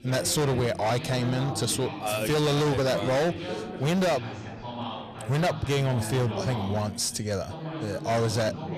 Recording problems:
distortion; heavy; 18% of the sound clipped
background chatter; loud; throughout; 3 voices, 9 dB below the speech

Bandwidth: 14.5 kHz